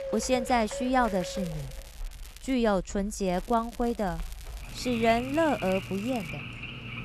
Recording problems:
animal sounds; noticeable; throughout; 10 dB below the speech
household noises; faint; throughout; 20 dB below the speech
crackling; faint; from 1 to 2.5 s and from 3.5 to 6.5 s; 20 dB below the speech

